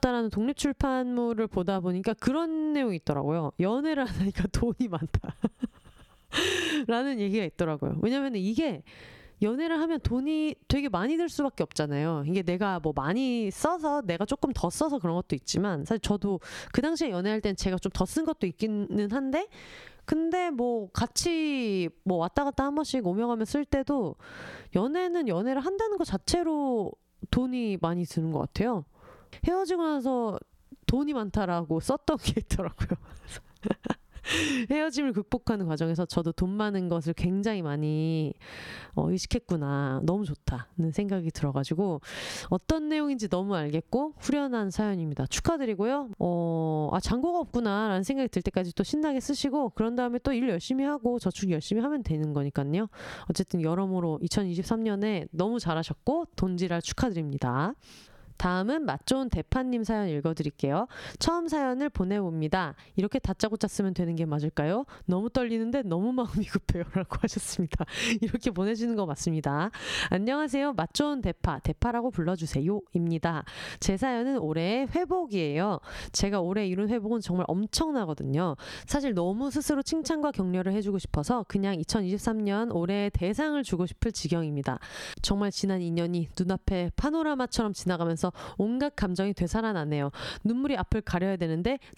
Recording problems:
squashed, flat; somewhat

